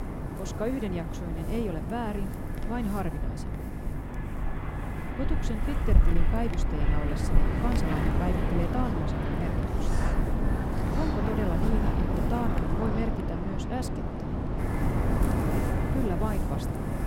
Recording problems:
wind noise on the microphone; heavy; 1 dB above the speech
electrical hum; noticeable; throughout; 50 Hz, 20 dB below the speech

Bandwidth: 16 kHz